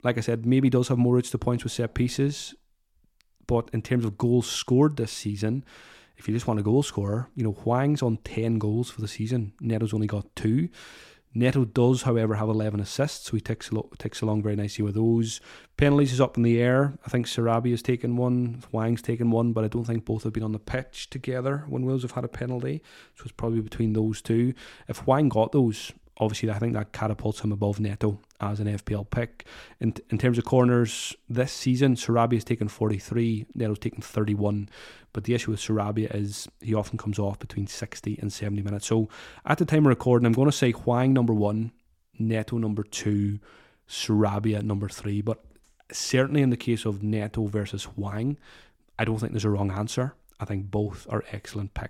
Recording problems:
none

